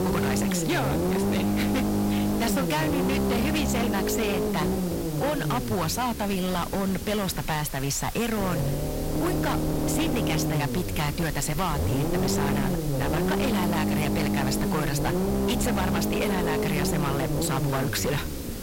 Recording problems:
distortion; heavy; 32% of the sound clipped
low rumble; loud; throughout; 2 dB below the speech
hiss; noticeable; throughout; 10 dB below the speech

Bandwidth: 16 kHz